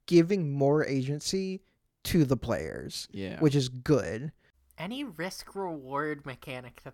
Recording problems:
none

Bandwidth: 18 kHz